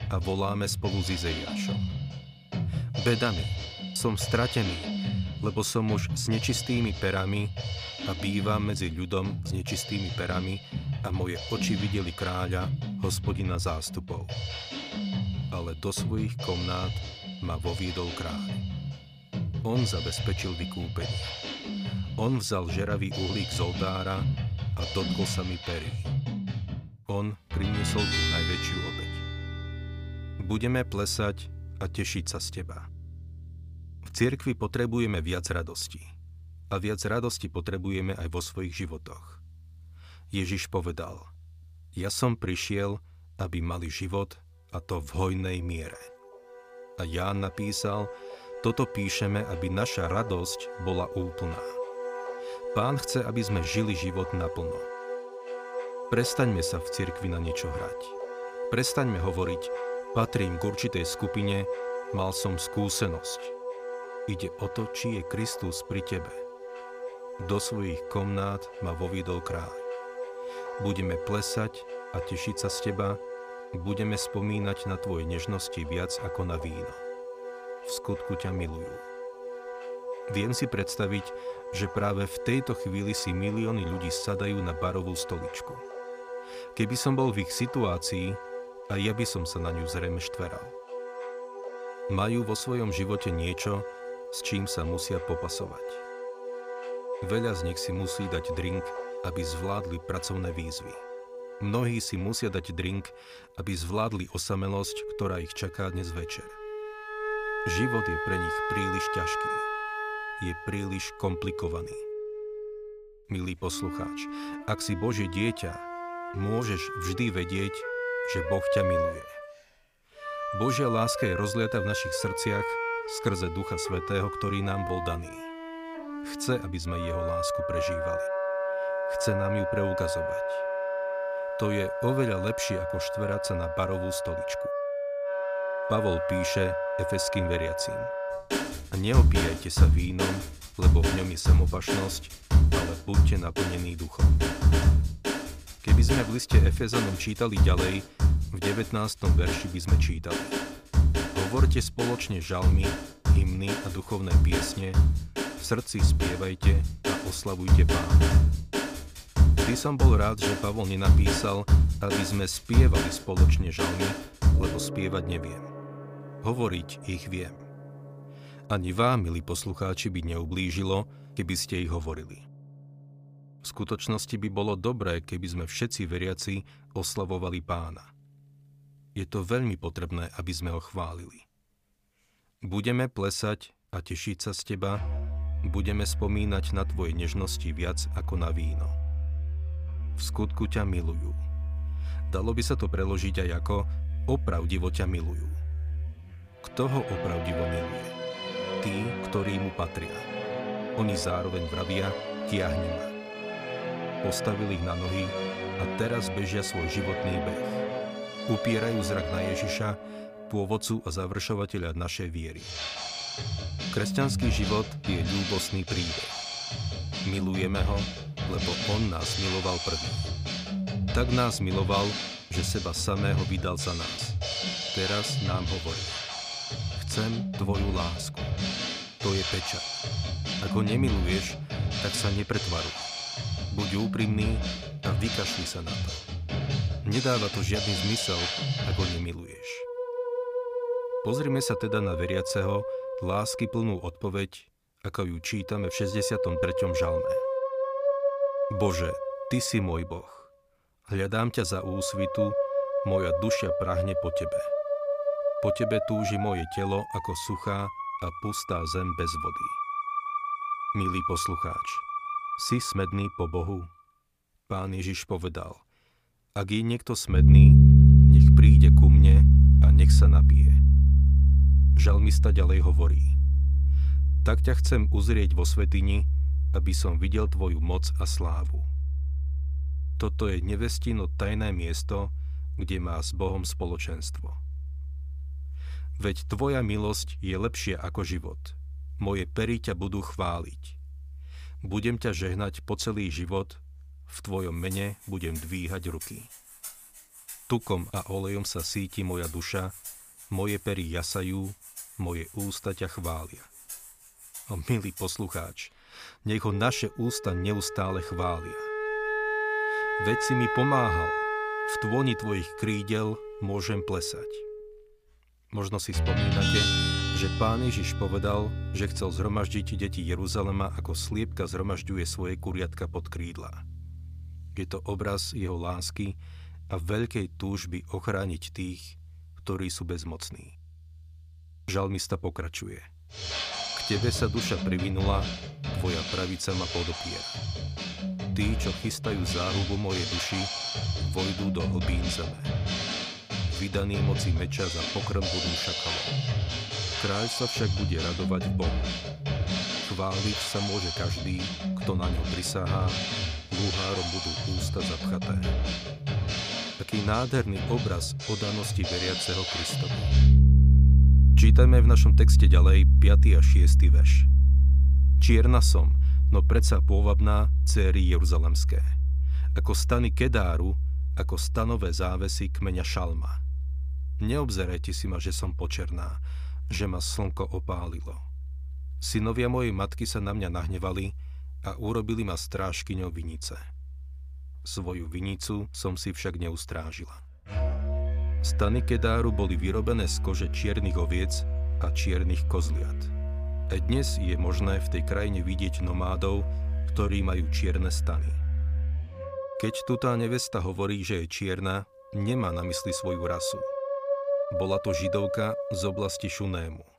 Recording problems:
background music; very loud; throughout; 3 dB above the speech

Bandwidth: 15 kHz